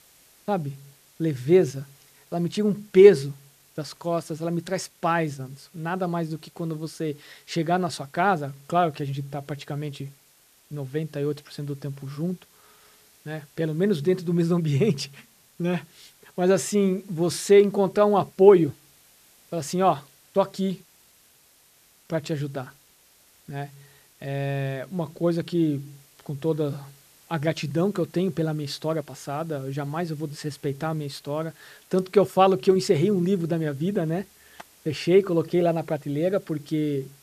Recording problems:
hiss; faint; throughout; 30 dB below the speech

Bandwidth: 14.5 kHz